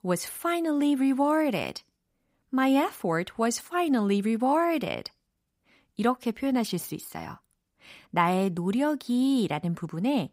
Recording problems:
none

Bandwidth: 15.5 kHz